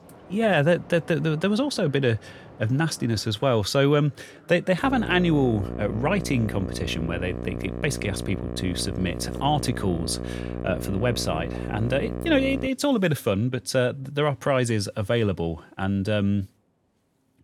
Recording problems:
electrical hum; noticeable; from 5 to 13 s; 60 Hz, 10 dB below the speech
train or aircraft noise; faint; throughout; 25 dB below the speech

